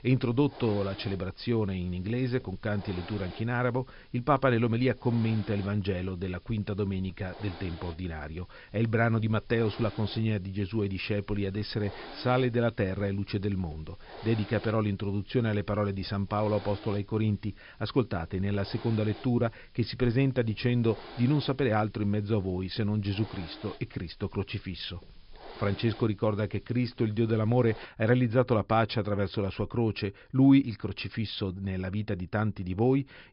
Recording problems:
high frequencies cut off; noticeable; nothing above 5.5 kHz
hiss; noticeable; until 28 s; 20 dB below the speech

